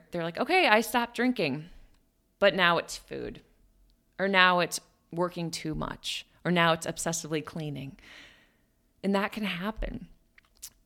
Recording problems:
none

